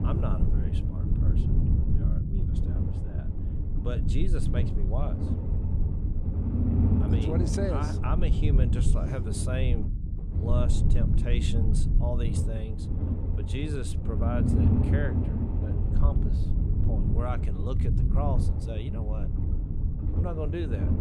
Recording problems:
low rumble; loud; throughout; 2 dB below the speech

